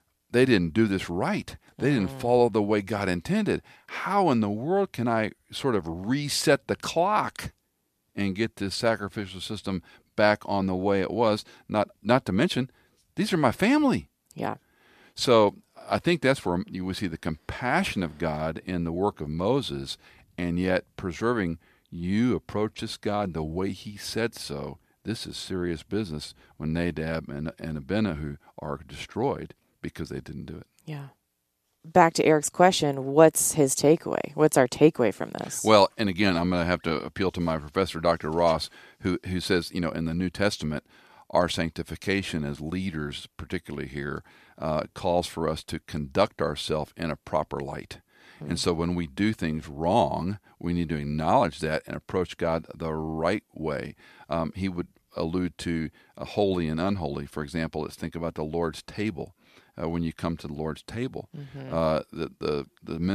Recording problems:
abrupt cut into speech; at the end

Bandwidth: 14.5 kHz